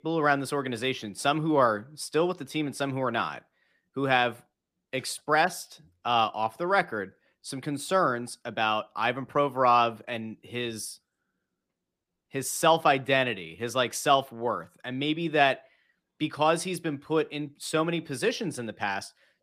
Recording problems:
none

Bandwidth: 15 kHz